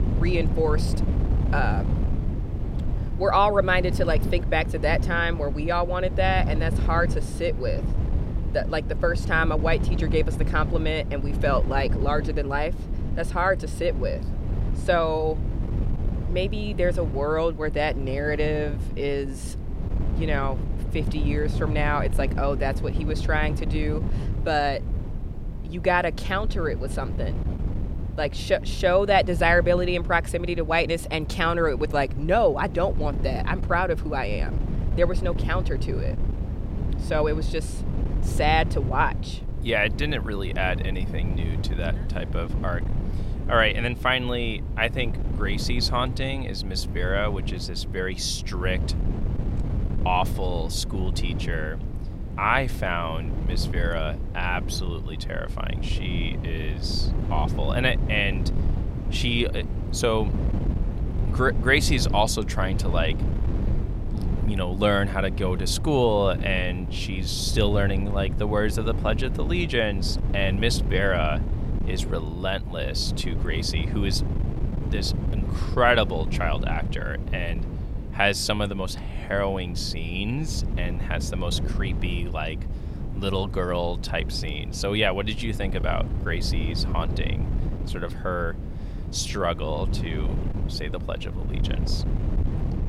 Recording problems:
wind noise on the microphone; occasional gusts; 15 dB below the speech

